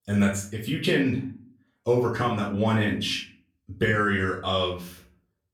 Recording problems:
off-mic speech; far
room echo; slight; dies away in 0.4 s

